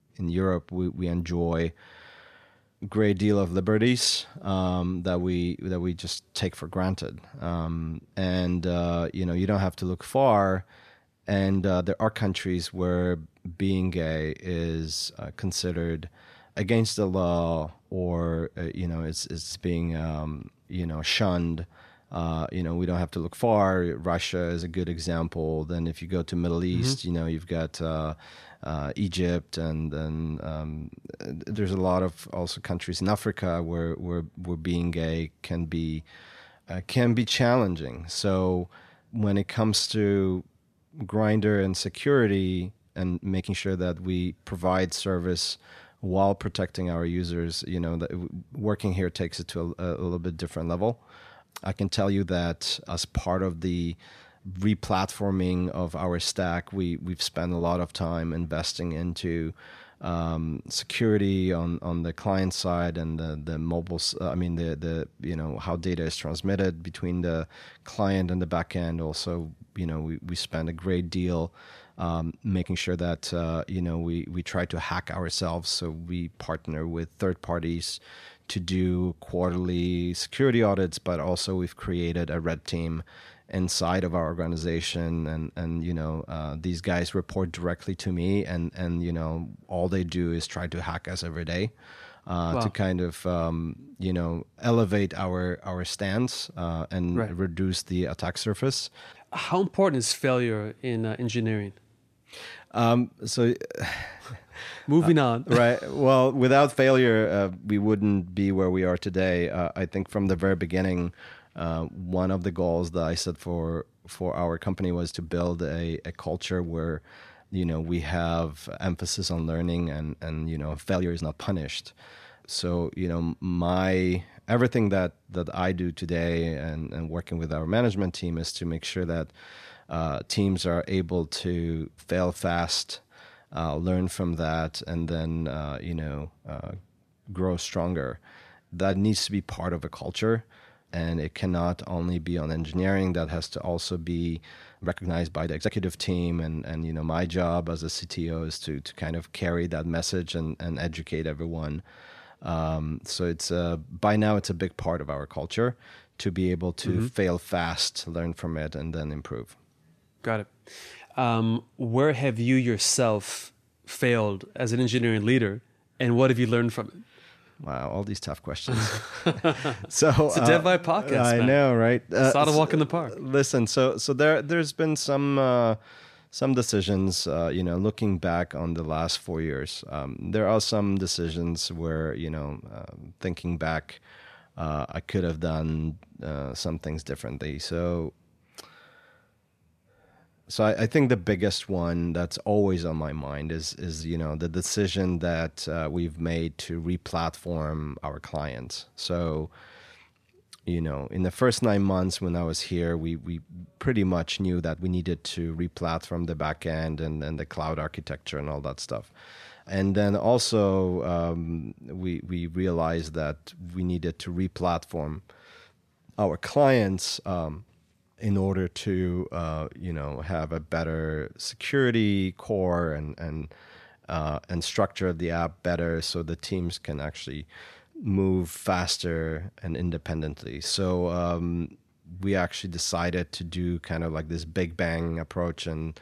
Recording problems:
uneven, jittery; strongly; from 11 s to 3:47

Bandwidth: 14 kHz